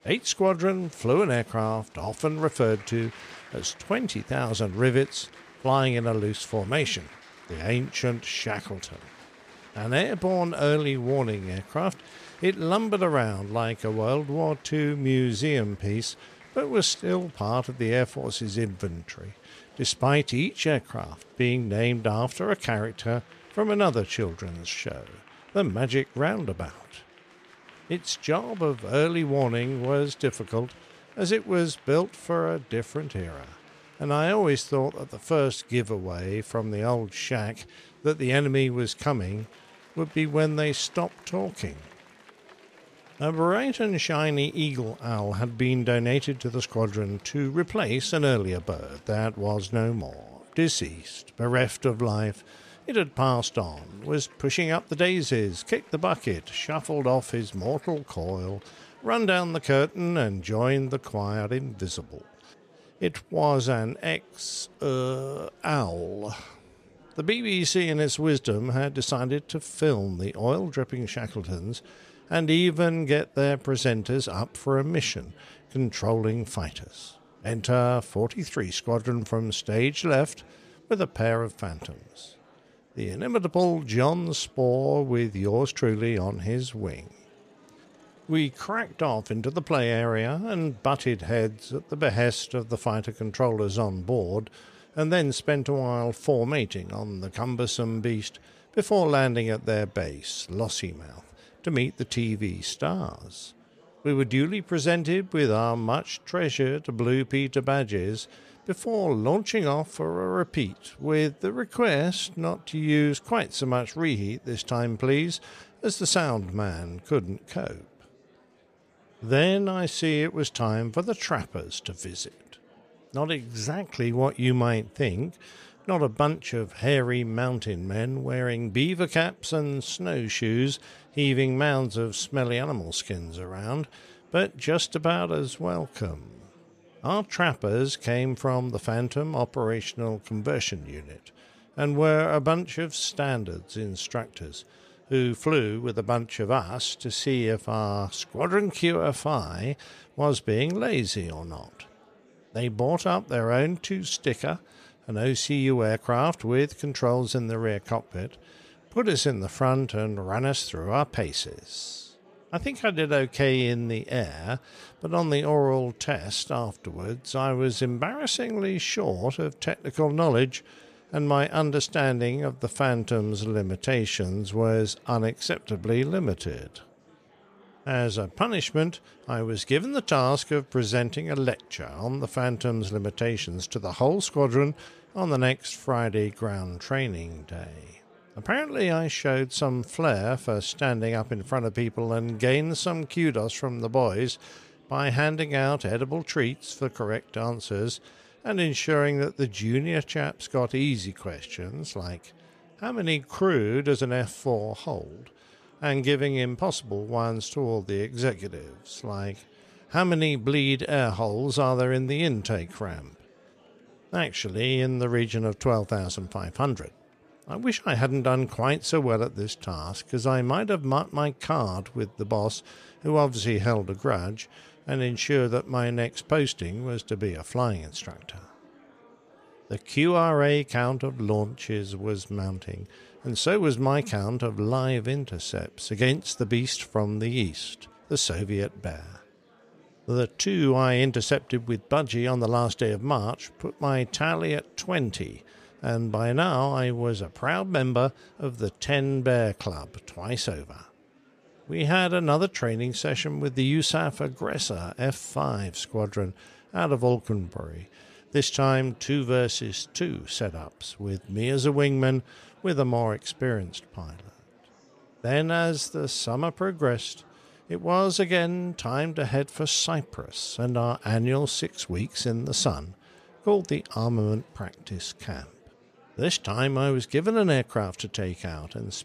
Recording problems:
murmuring crowd; faint; throughout; 30 dB below the speech

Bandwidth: 14.5 kHz